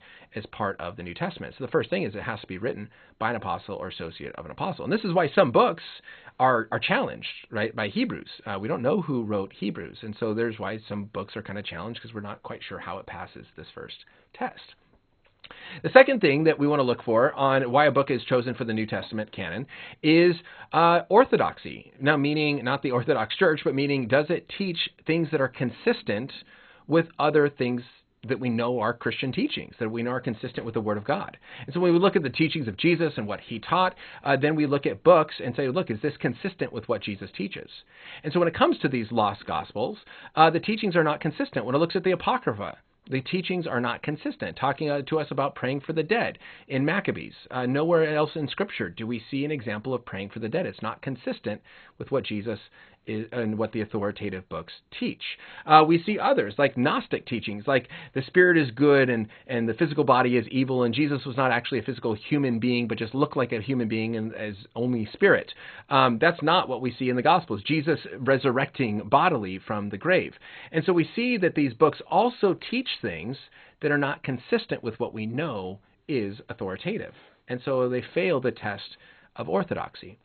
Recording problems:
garbled, watery; badly; nothing above 4 kHz

